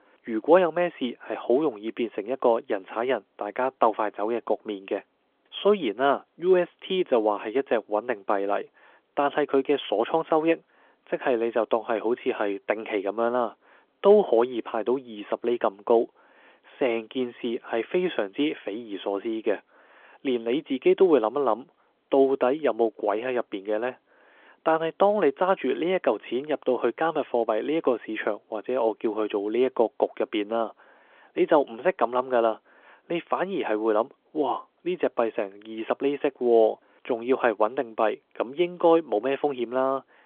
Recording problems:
phone-call audio; nothing above 3.5 kHz

